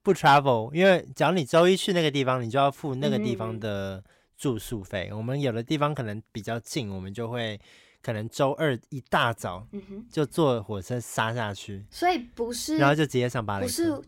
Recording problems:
none

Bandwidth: 16.5 kHz